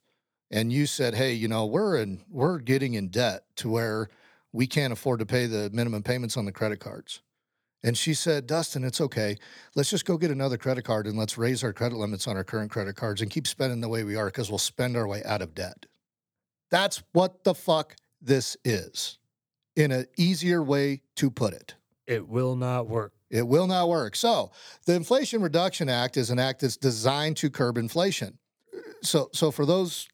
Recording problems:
none

